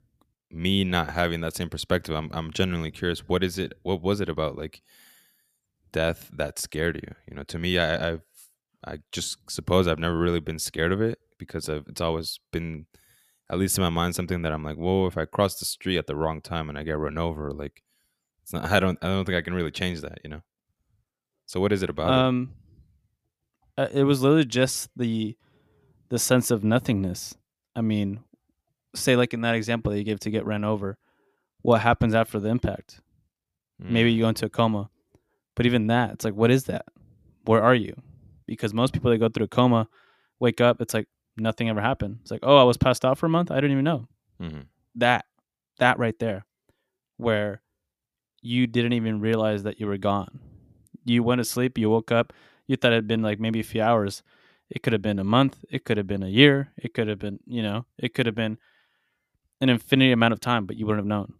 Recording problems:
none

